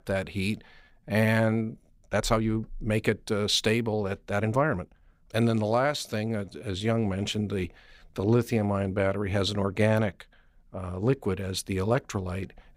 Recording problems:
uneven, jittery; strongly; from 1 to 9 s

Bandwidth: 15.5 kHz